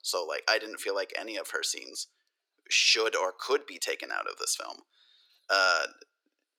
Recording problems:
thin; very; fading below 350 Hz

